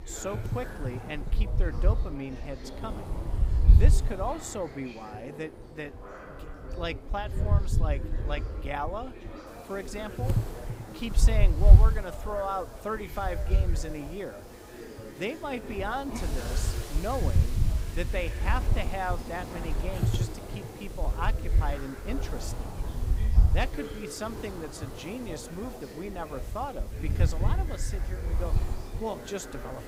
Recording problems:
wind noise on the microphone; heavy; 10 dB below the speech
chatter from many people; loud; throughout; 9 dB below the speech
hiss; noticeable; from 9.5 s on; 15 dB below the speech

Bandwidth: 15.5 kHz